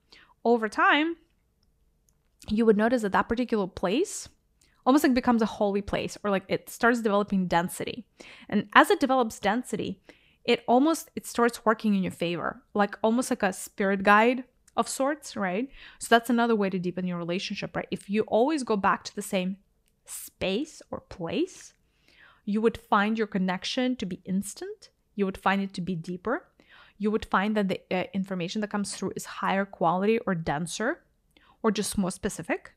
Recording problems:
none

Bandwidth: 15.5 kHz